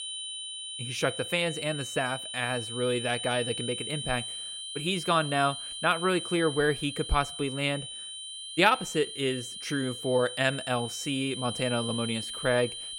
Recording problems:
high-pitched whine; loud; throughout; 3 kHz, 6 dB below the speech

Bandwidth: 16 kHz